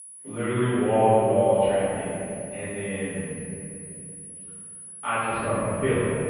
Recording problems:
room echo; strong; dies away in 2.5 s
off-mic speech; far
muffled; very; fading above 3 kHz
high-pitched whine; noticeable; throughout; 10 kHz, 15 dB below the speech

